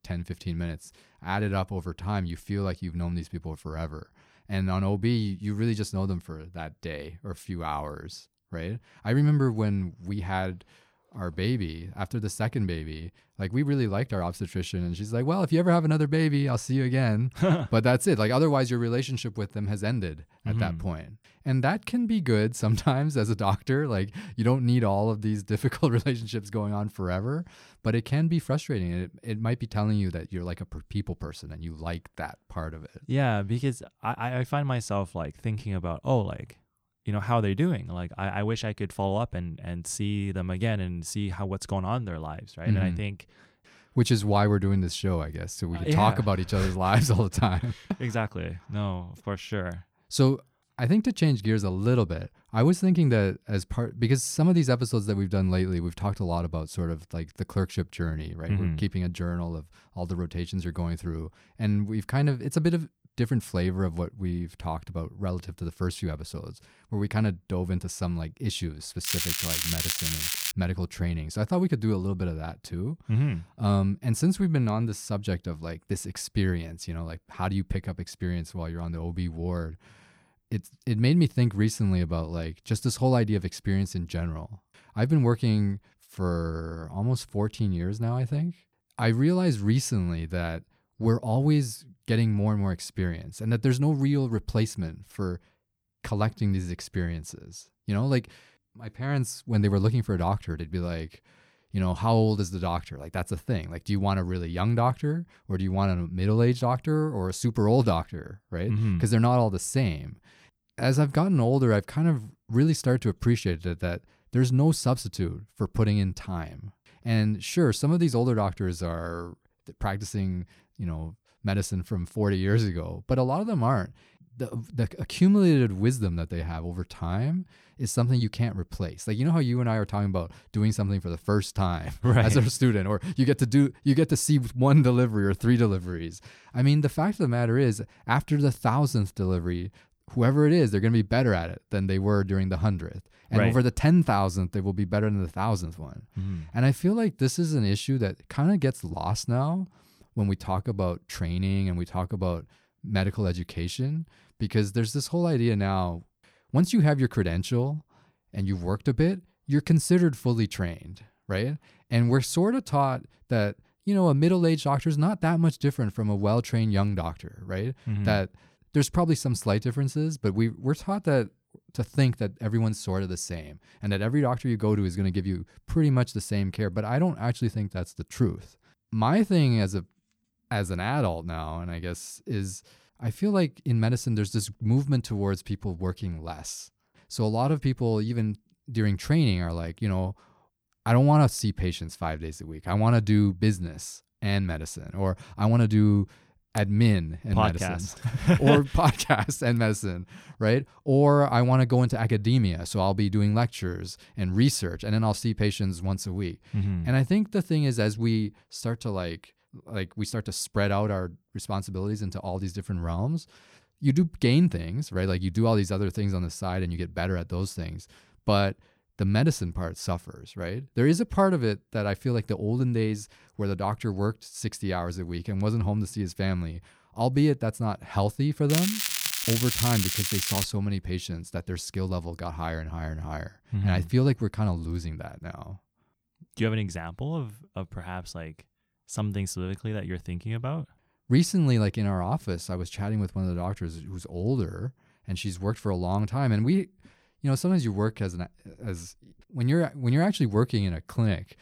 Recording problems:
crackling; loud; from 1:09 to 1:11 and from 3:49 to 3:50; 1 dB below the speech

